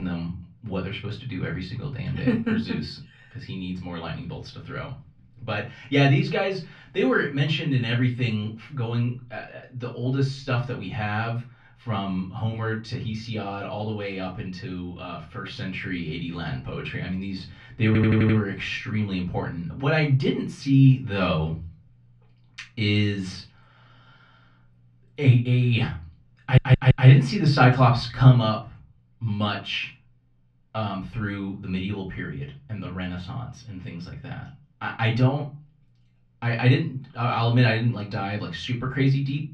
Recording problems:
off-mic speech; far
muffled; slightly; fading above 3 kHz
room echo; very slight; dies away in 0.3 s
abrupt cut into speech; at the start
audio stuttering; at 18 s and at 26 s

